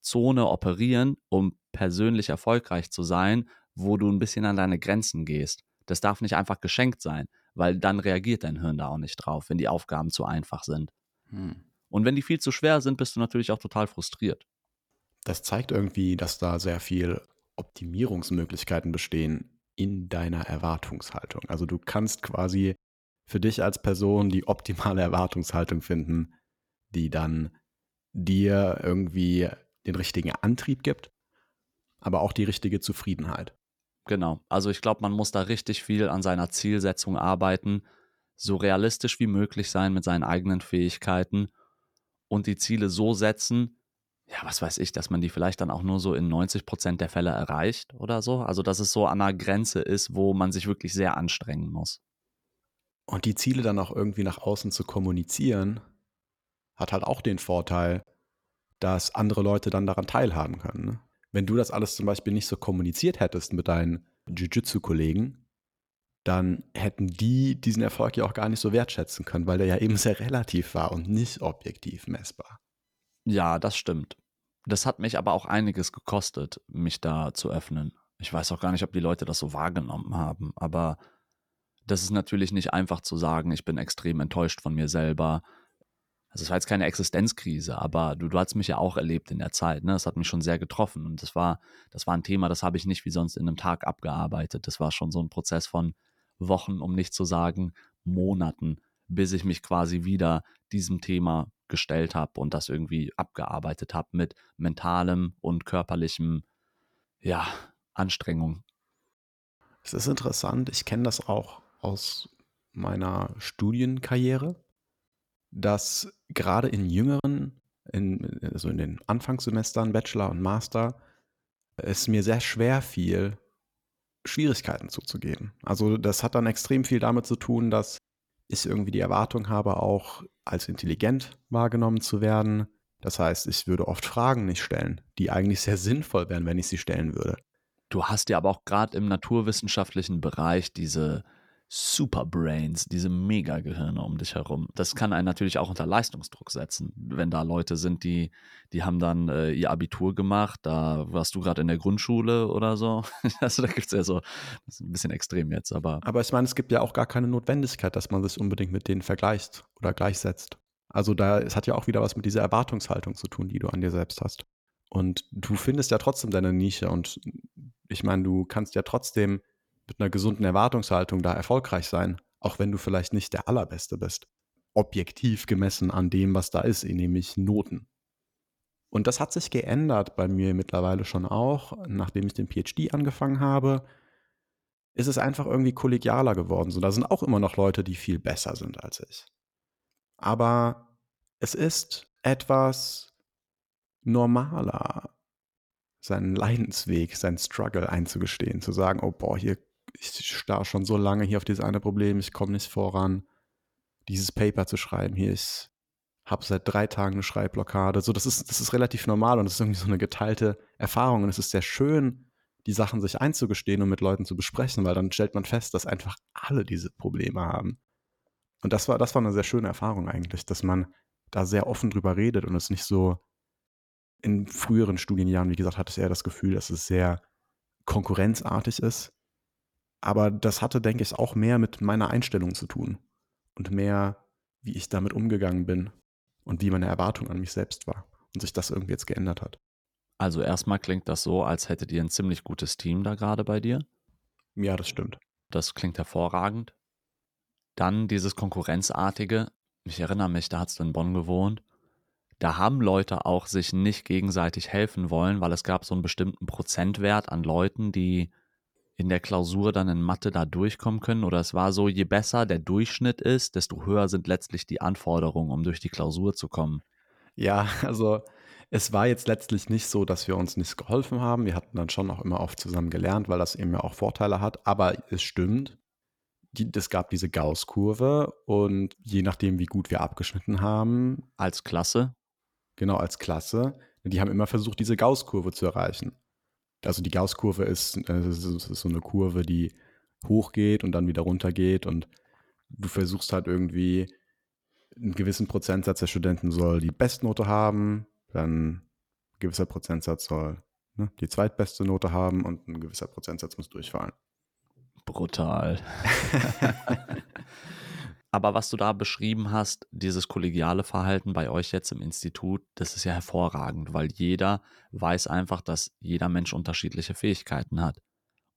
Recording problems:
choppy; occasionally; at 1:57; 1% of the speech affected

